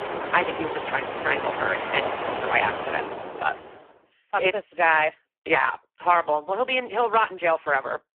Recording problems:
phone-call audio; poor line
traffic noise; loud; until 3.5 s; 6 dB below the speech

